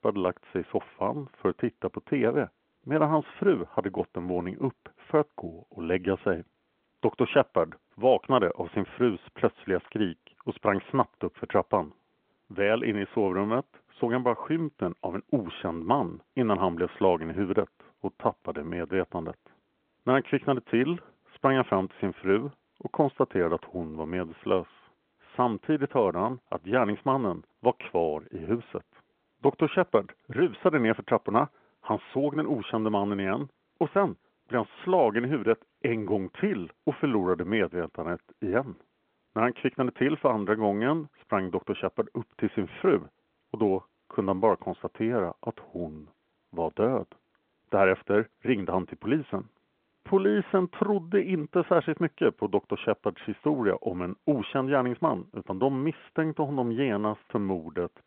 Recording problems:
phone-call audio

